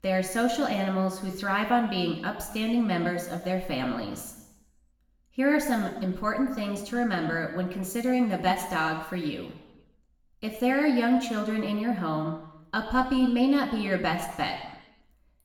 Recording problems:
room echo; noticeable; dies away in 0.9 s
off-mic speech; somewhat distant

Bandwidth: 18 kHz